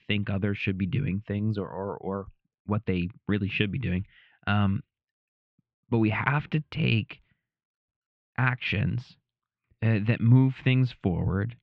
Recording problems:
muffled; very; fading above 2.5 kHz

